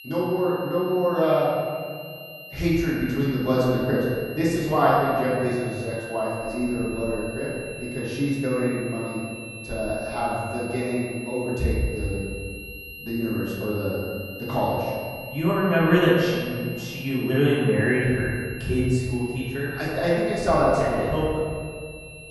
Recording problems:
room echo; strong; dies away in 1.9 s
off-mic speech; far
muffled; slightly; fading above 3 kHz
high-pitched whine; noticeable; throughout; 2.5 kHz, 15 dB below the speech

